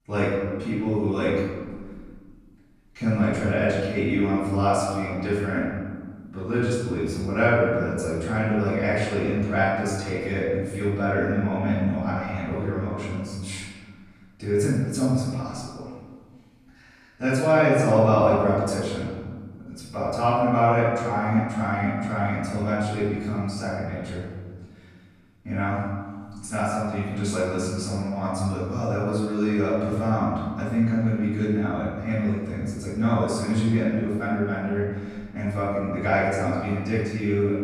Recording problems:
room echo; strong; dies away in 1.5 s
off-mic speech; far

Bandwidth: 14.5 kHz